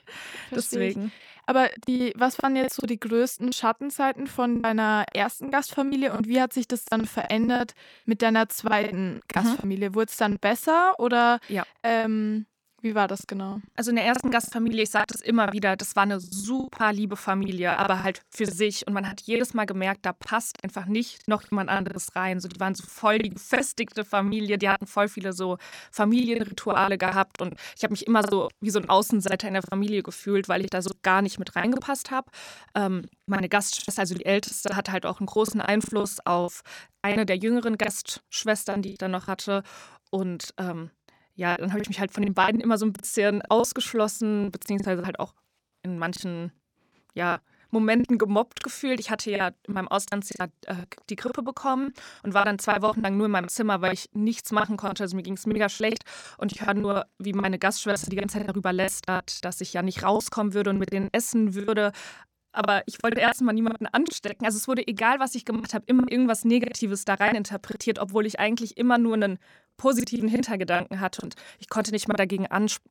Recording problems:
choppy; very; 11% of the speech affected

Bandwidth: 18.5 kHz